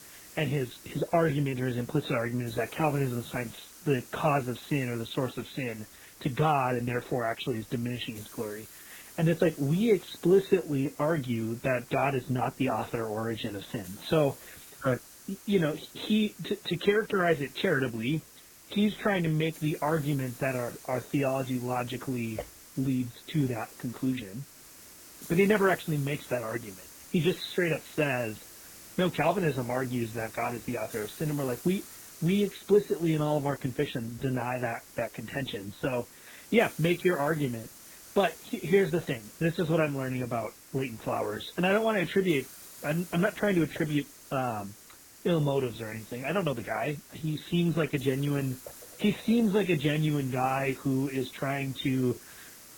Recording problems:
garbled, watery; badly; nothing above 4 kHz
hiss; noticeable; throughout; 20 dB below the speech

